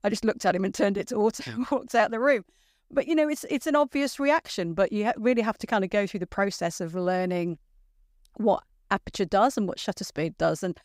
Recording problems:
none

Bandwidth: 15.5 kHz